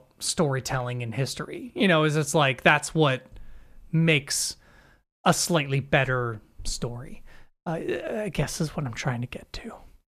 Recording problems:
none

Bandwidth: 14.5 kHz